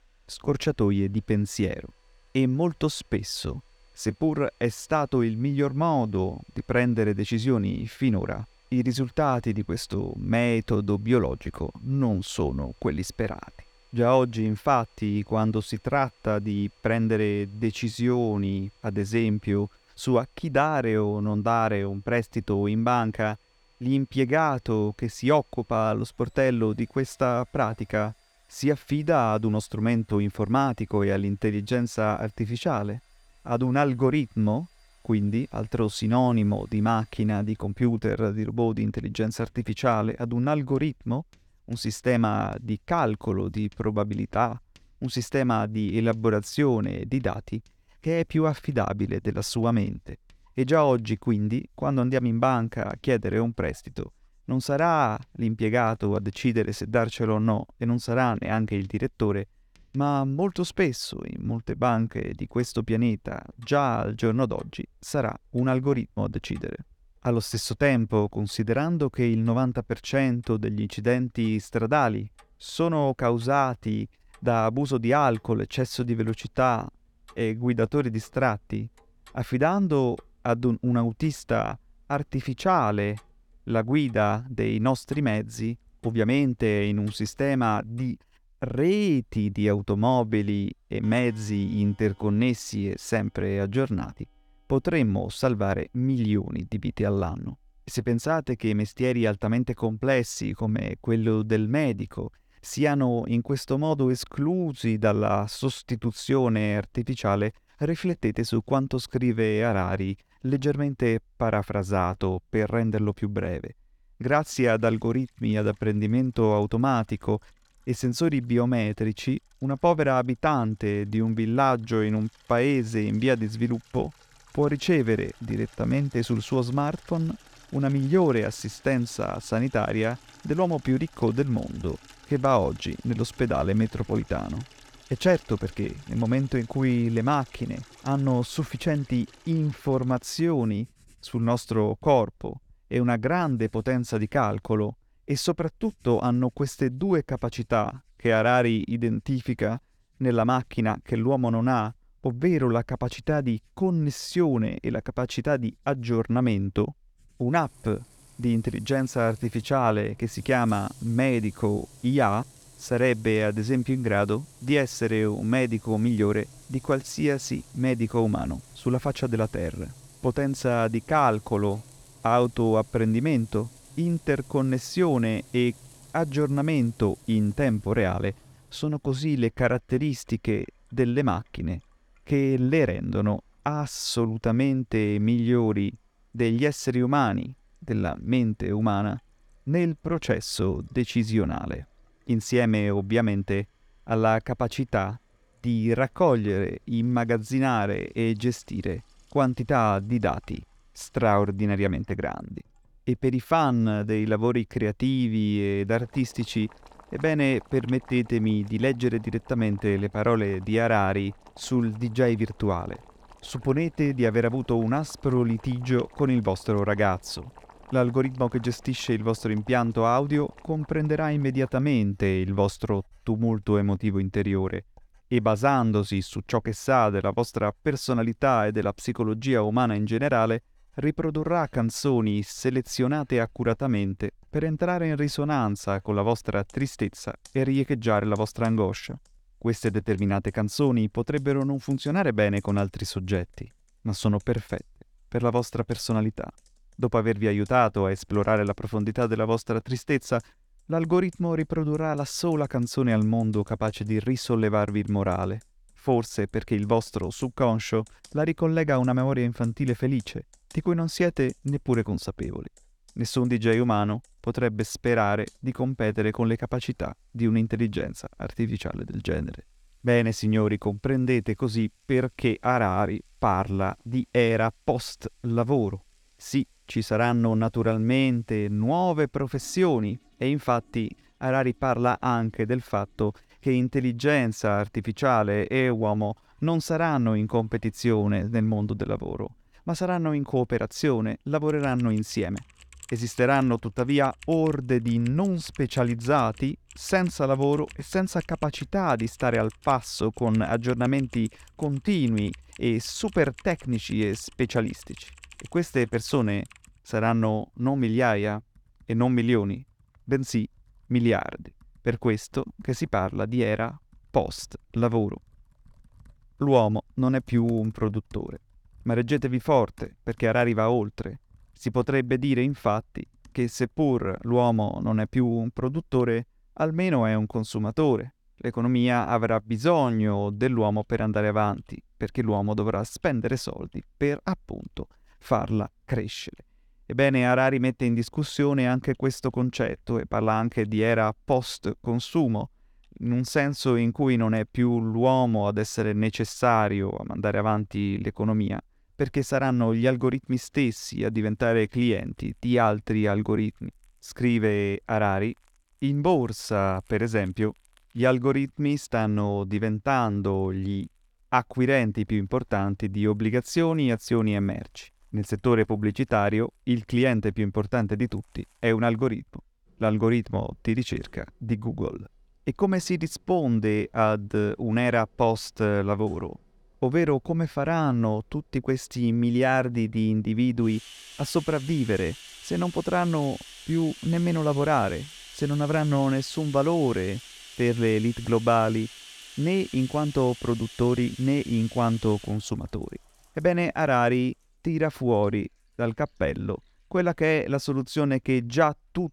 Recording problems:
household noises; faint; throughout; 25 dB below the speech

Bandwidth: 18 kHz